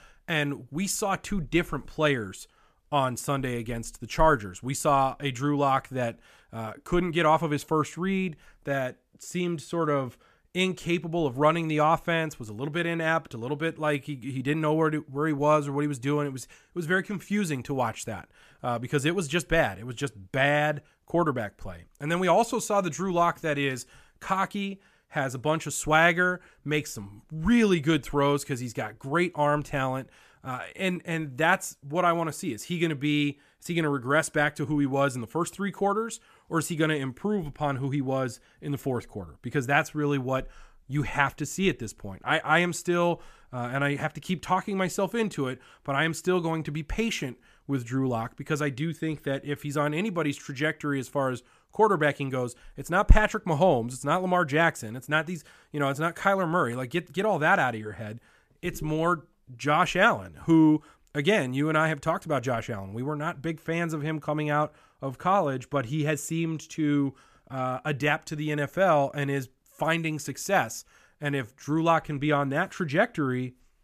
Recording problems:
none

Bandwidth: 14.5 kHz